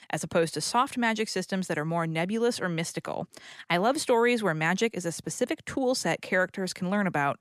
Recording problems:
none

